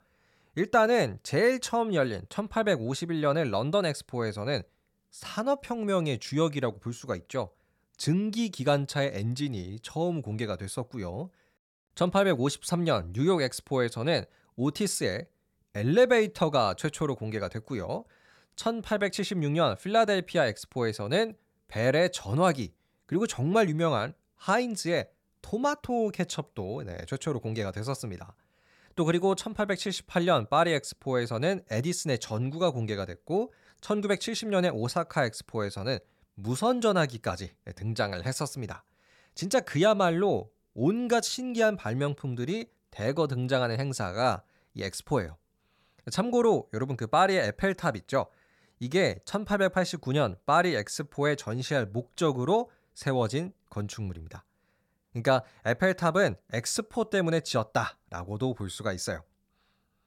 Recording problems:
none

